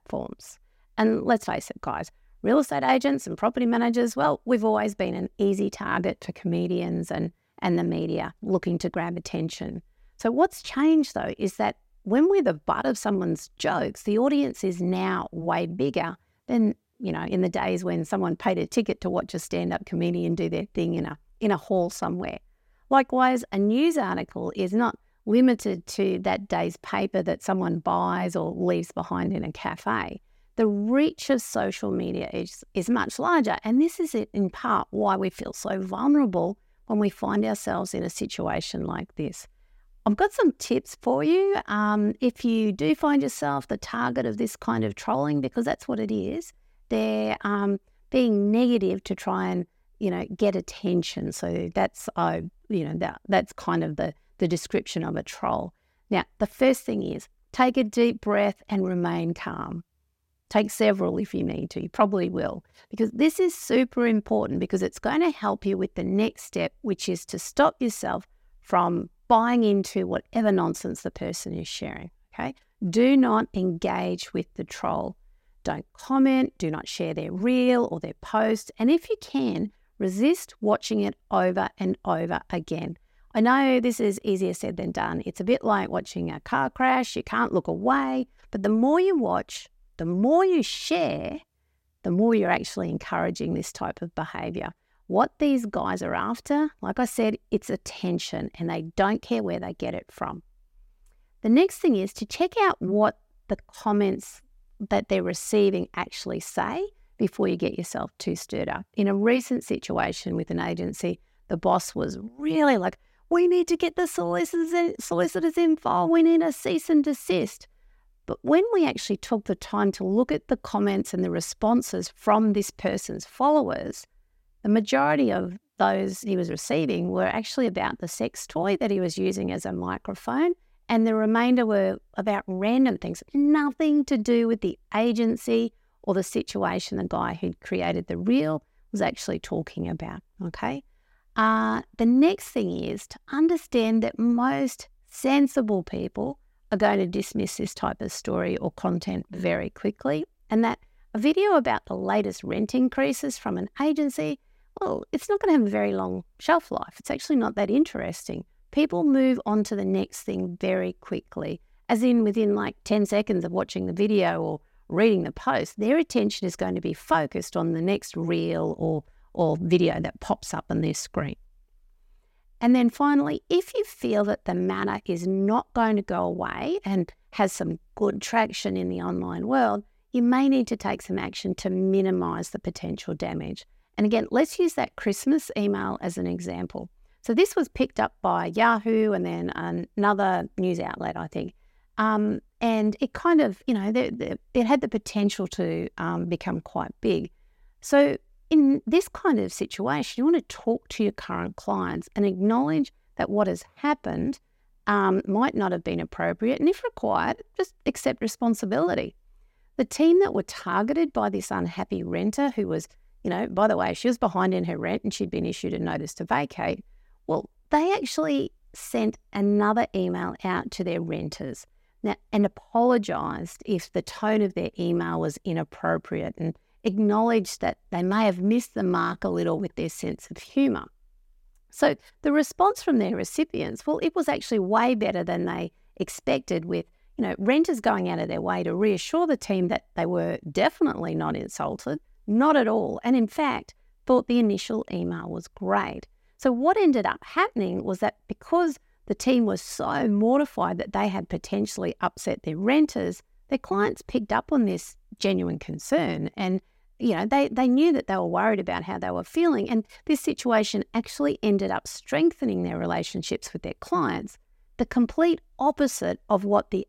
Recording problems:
none

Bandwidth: 16 kHz